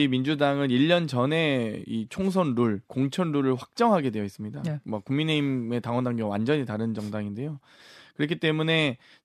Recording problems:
abrupt cut into speech; at the start

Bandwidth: 14 kHz